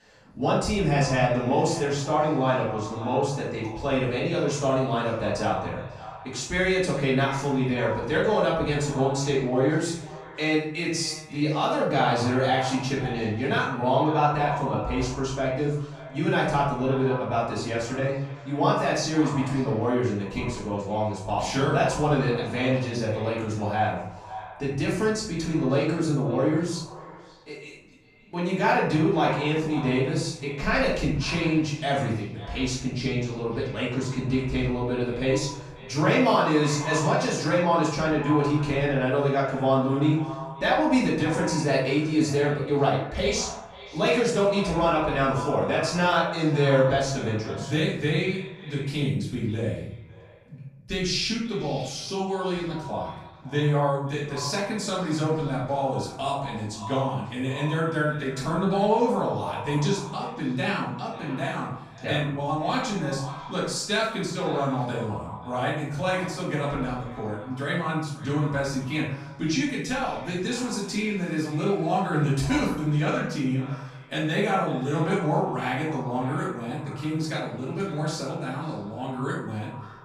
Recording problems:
off-mic speech; far
echo of what is said; noticeable; throughout; 540 ms later, 15 dB below the speech
room echo; noticeable; dies away in 0.7 s

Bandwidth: 15 kHz